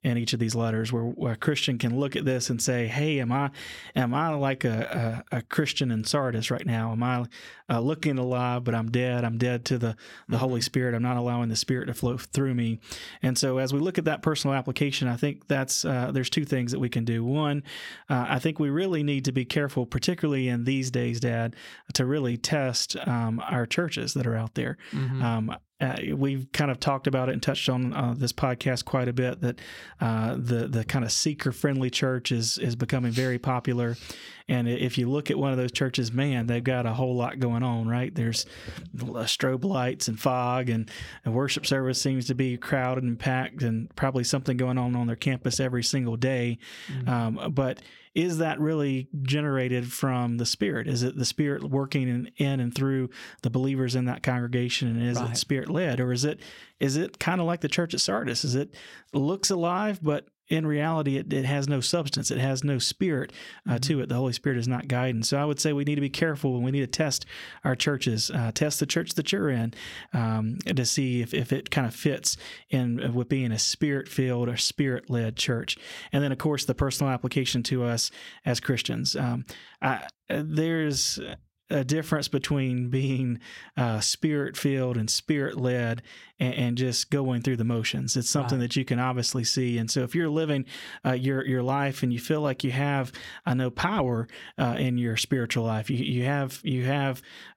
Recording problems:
squashed, flat; somewhat

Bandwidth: 16.5 kHz